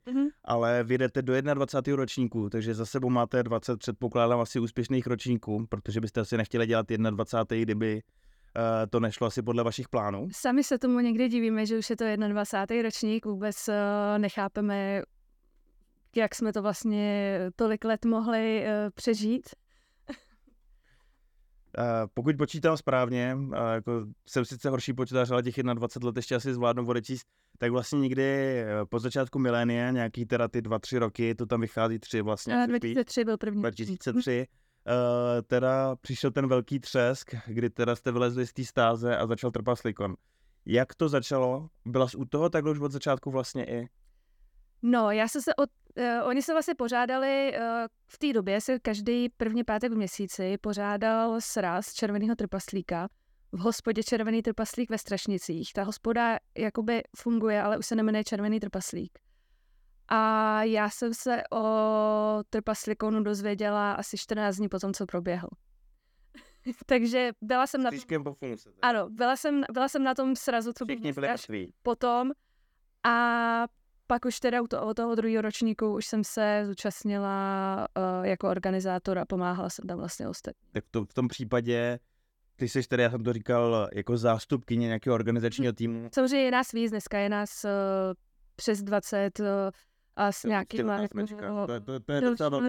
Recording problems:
abrupt cut into speech; at the end

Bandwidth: 18.5 kHz